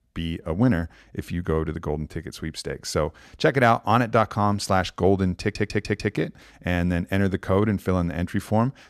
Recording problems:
audio stuttering; at 5.5 s

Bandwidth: 14 kHz